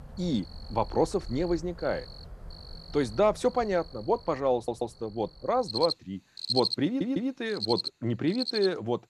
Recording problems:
animal sounds; loud; throughout; 7 dB below the speech
audio stuttering; at 4.5 s and at 7 s

